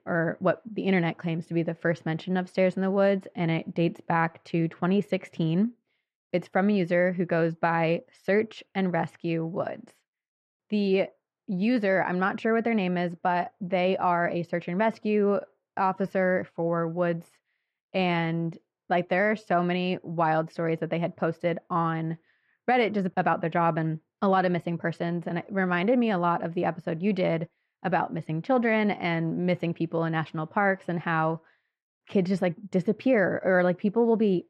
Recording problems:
muffled; slightly; fading above 4 kHz

